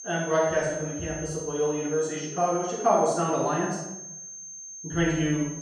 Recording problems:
room echo; strong; dies away in 0.9 s
off-mic speech; far
high-pitched whine; noticeable; throughout; 6.5 kHz, 10 dB below the speech

